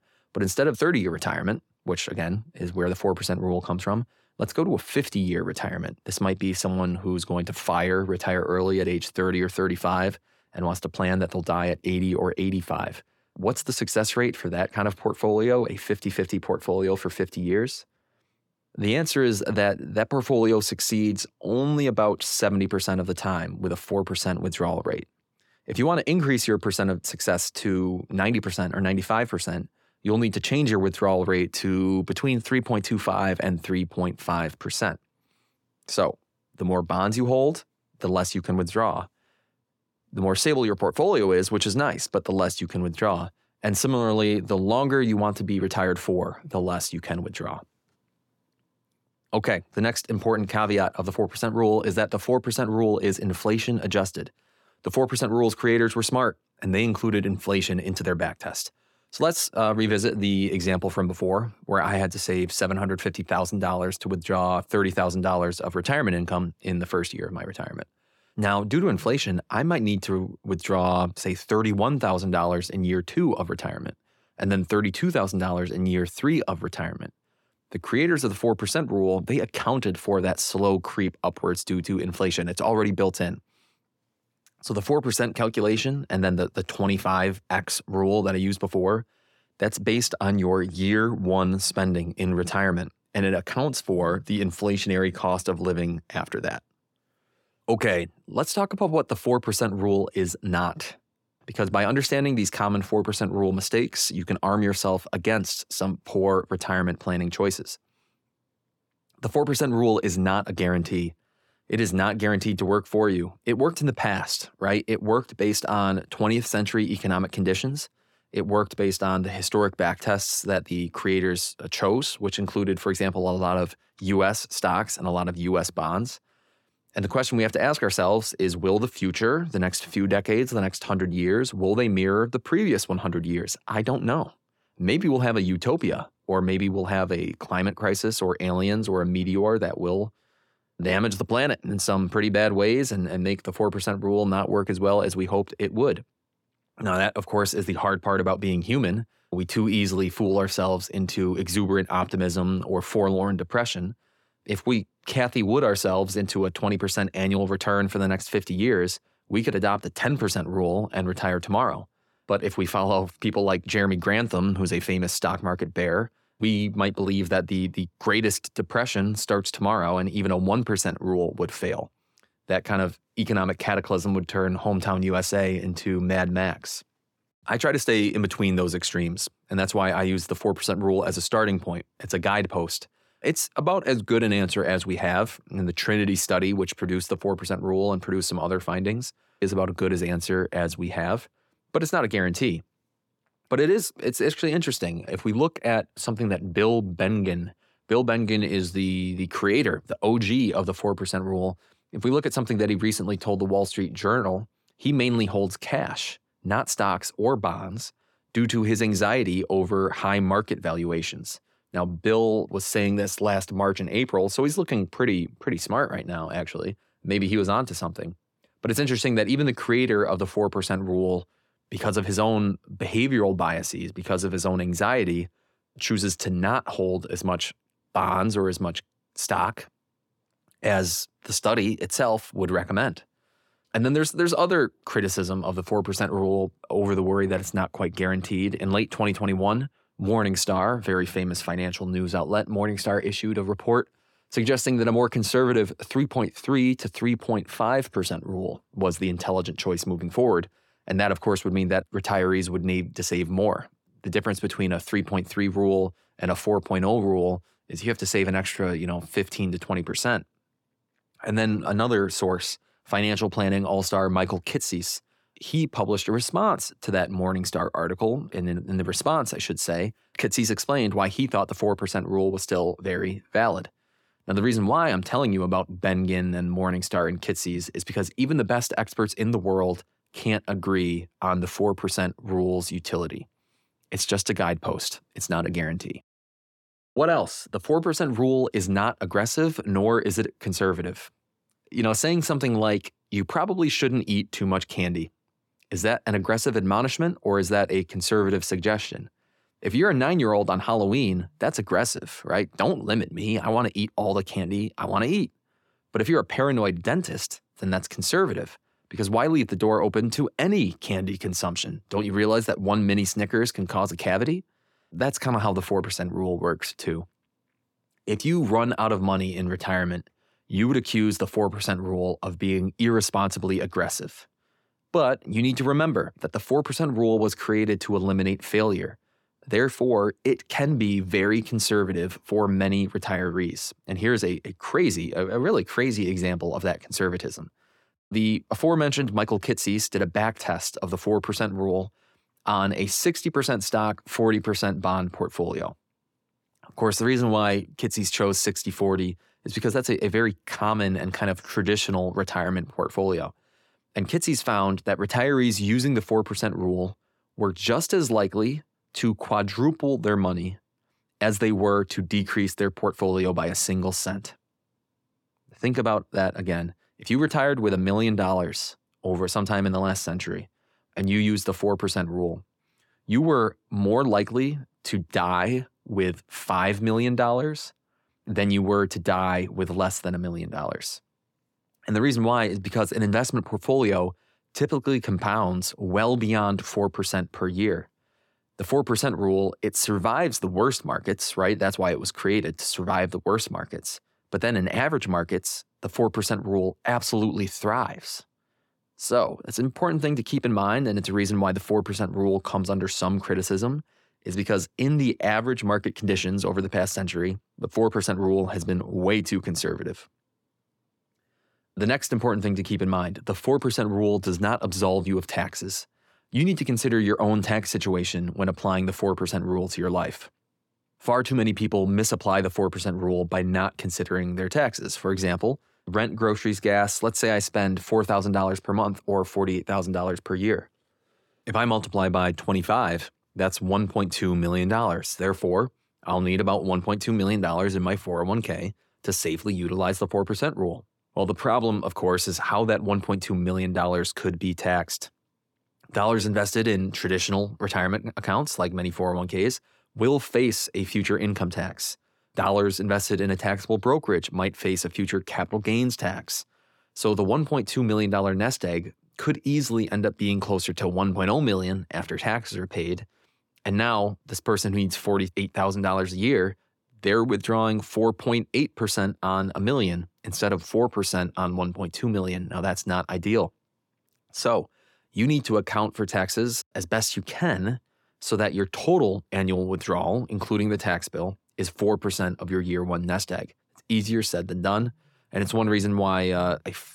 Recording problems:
none

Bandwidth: 17 kHz